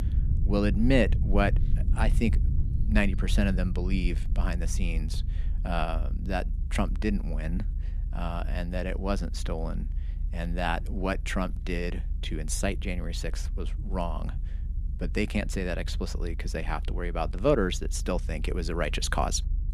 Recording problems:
low rumble; noticeable; throughout; 20 dB below the speech

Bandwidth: 14.5 kHz